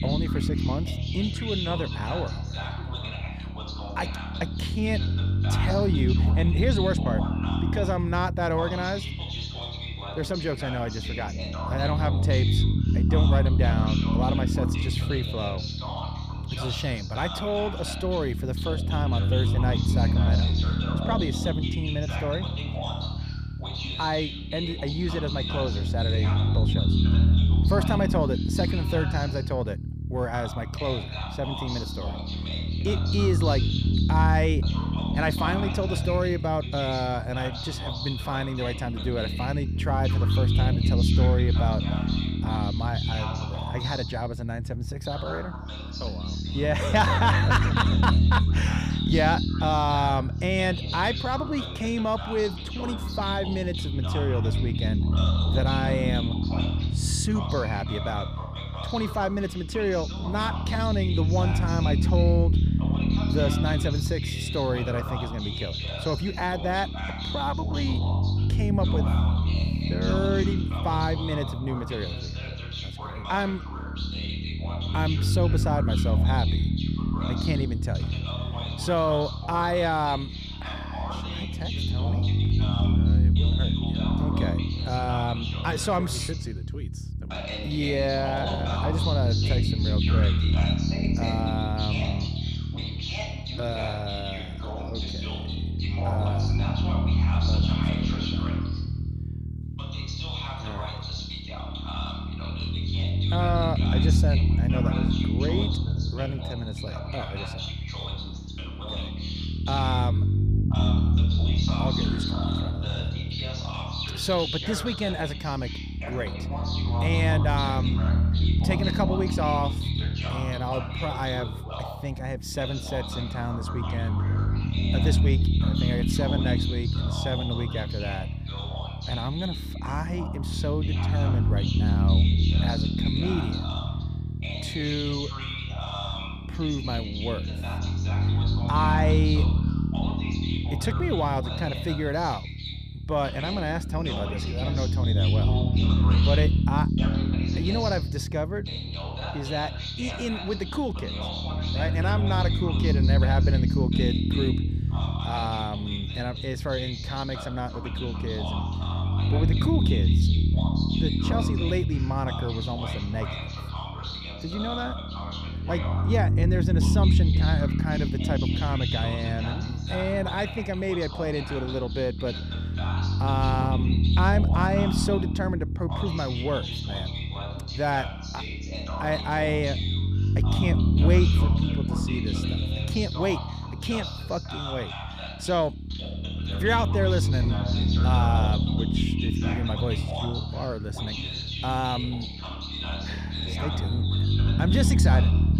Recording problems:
voice in the background; loud; throughout; 6 dB below the speech
low rumble; loud; throughout; 8 dB below the speech

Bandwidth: 15 kHz